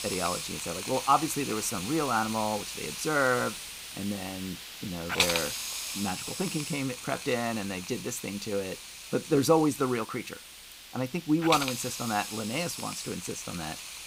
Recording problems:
hiss; loud; throughout; 5 dB below the speech

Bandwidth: 15.5 kHz